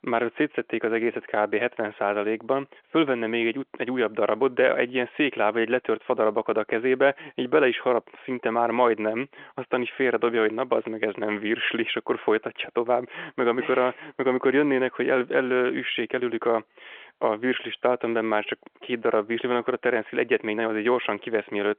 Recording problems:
phone-call audio; nothing above 3.5 kHz

